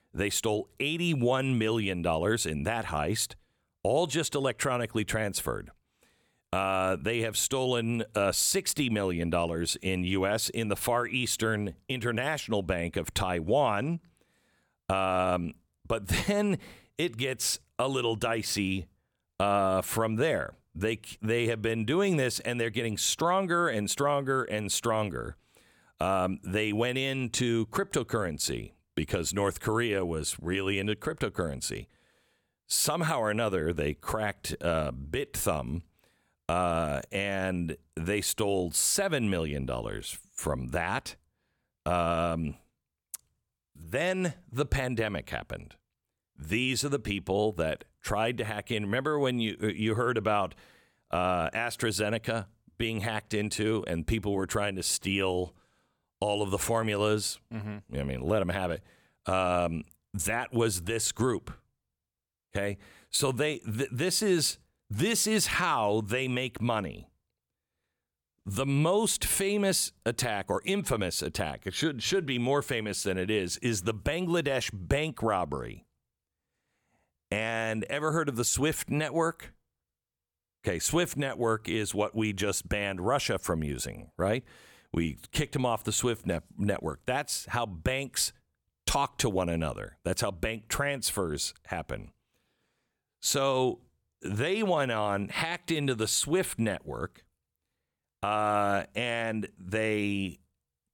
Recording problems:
none

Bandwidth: 18.5 kHz